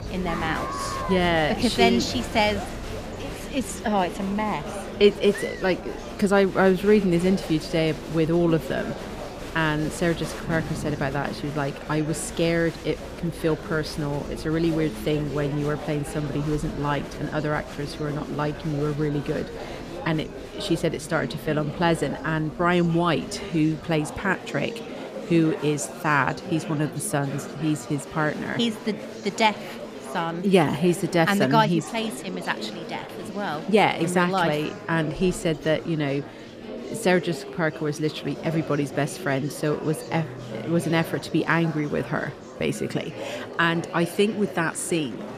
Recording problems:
murmuring crowd; noticeable; throughout; 10 dB below the speech
background music; faint; from 34 s on; 25 dB below the speech

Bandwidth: 14.5 kHz